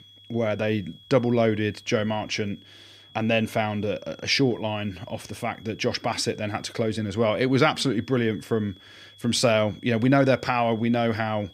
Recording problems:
high-pitched whine; faint; throughout; 3.5 kHz, 25 dB below the speech

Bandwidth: 15 kHz